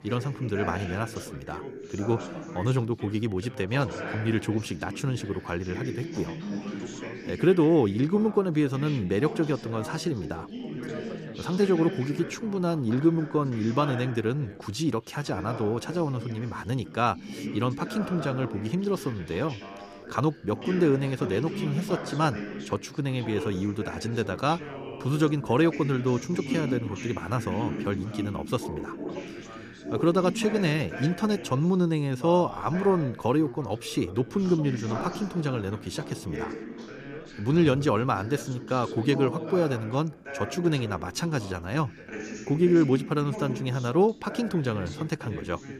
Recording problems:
background chatter; loud; throughout; 3 voices, 10 dB below the speech

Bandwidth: 14.5 kHz